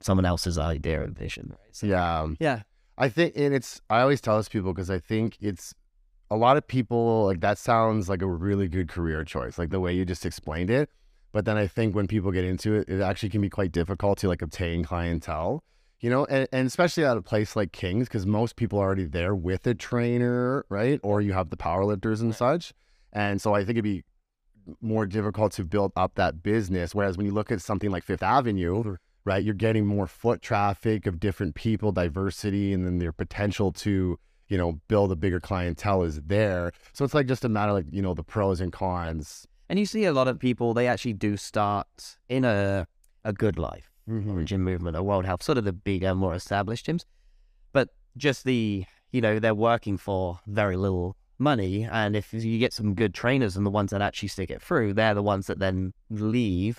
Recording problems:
uneven, jittery; strongly; from 14 to 53 s

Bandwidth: 15 kHz